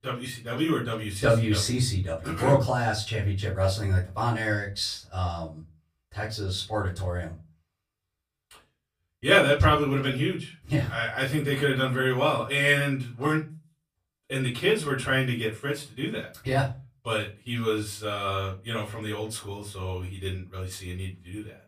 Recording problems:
off-mic speech; far
room echo; very slight; dies away in 0.2 s

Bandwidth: 15 kHz